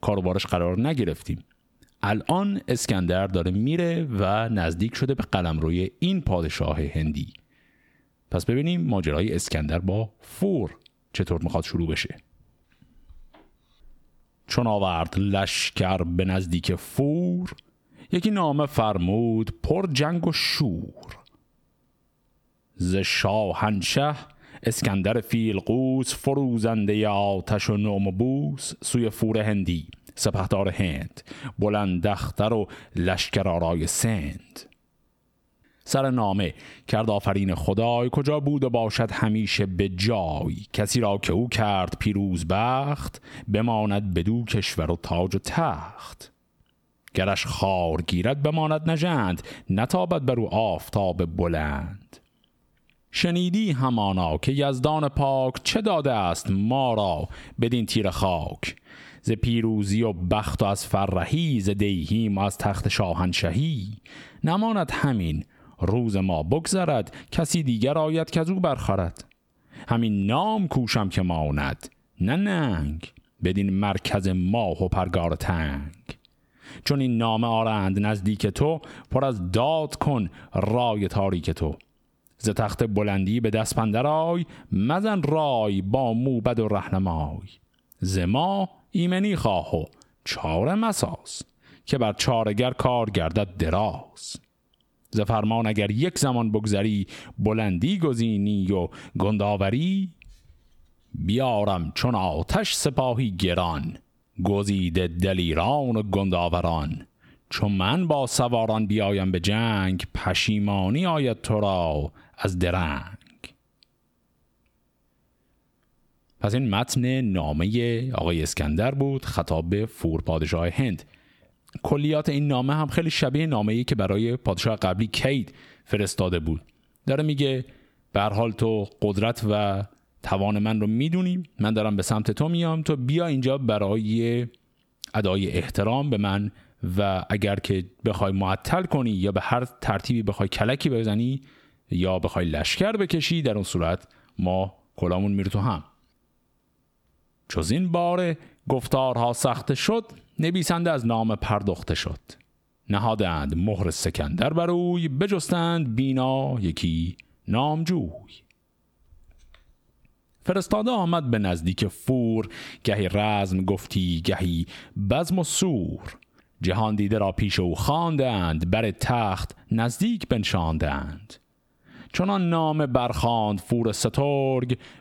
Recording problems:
squashed, flat; heavily

